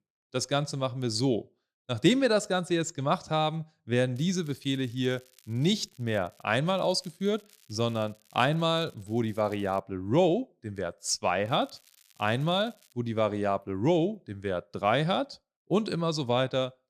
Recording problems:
crackling; faint; from 4 to 6.5 s, from 6.5 to 10 s and from 11 to 13 s; 30 dB below the speech

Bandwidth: 14.5 kHz